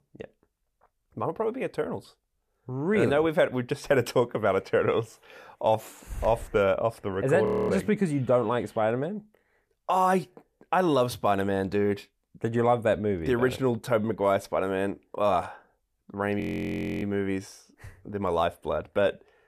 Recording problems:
audio freezing; at 7.5 s and at 16 s for 0.5 s

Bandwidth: 14.5 kHz